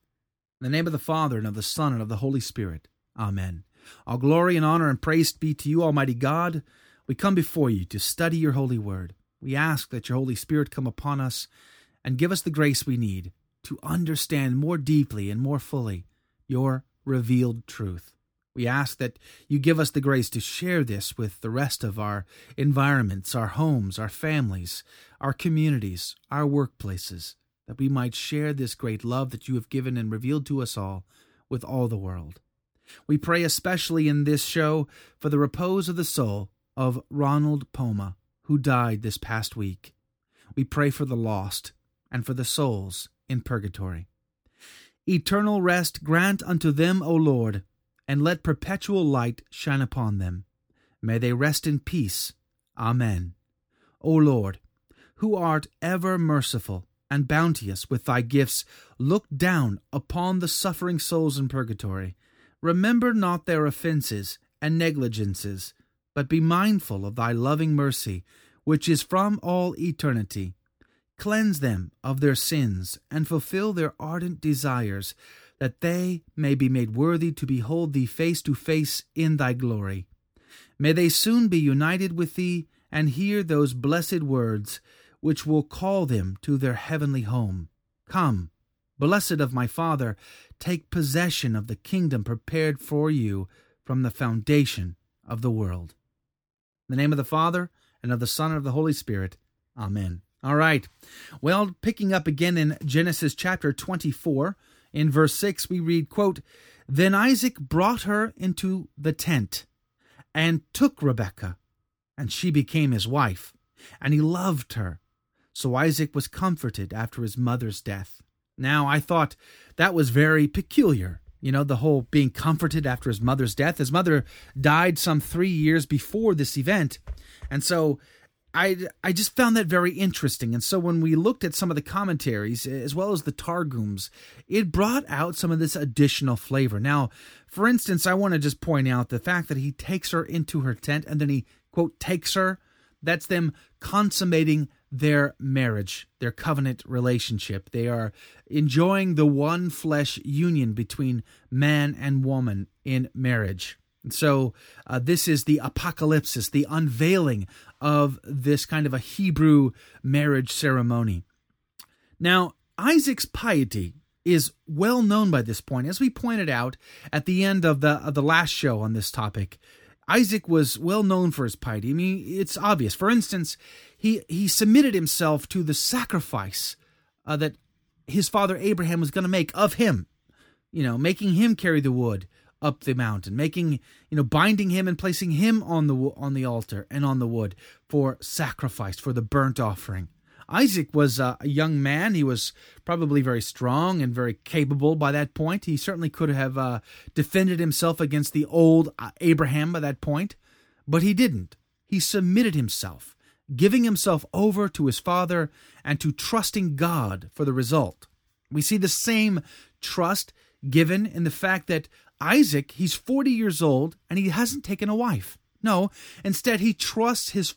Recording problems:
none

